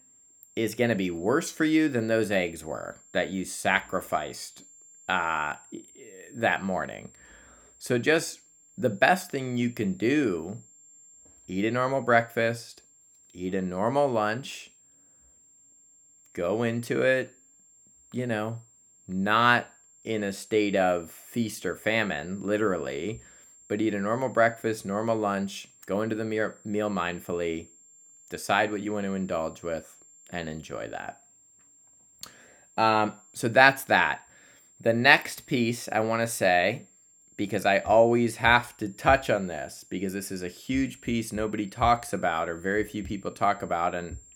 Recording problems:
high-pitched whine; faint; throughout; 7.5 kHz, 25 dB below the speech

